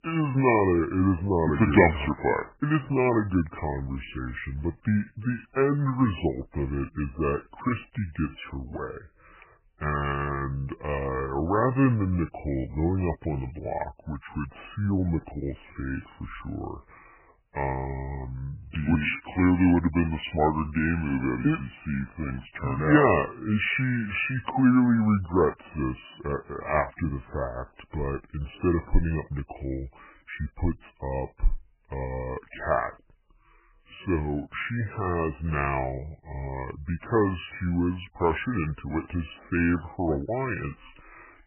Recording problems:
garbled, watery; badly; nothing above 3 kHz
wrong speed and pitch; too slow and too low; 0.7 times normal speed

